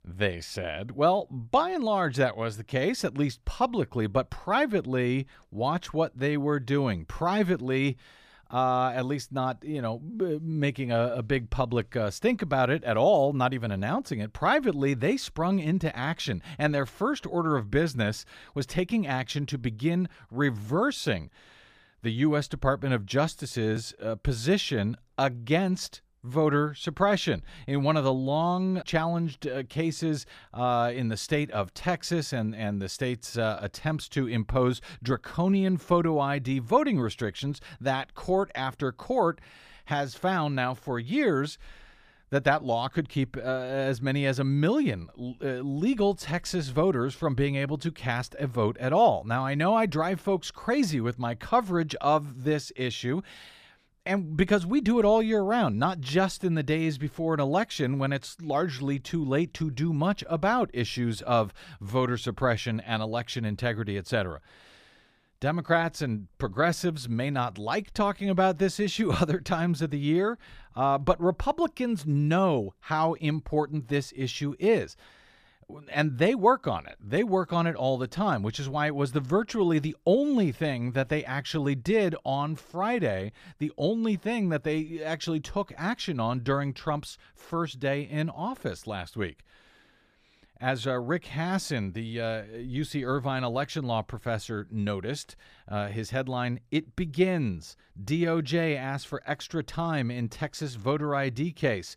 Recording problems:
none

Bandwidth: 15 kHz